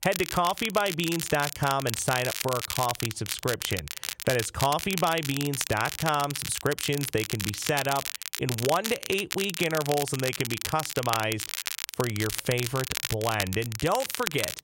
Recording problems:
crackle, like an old record; loud; 4 dB below the speech

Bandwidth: 16 kHz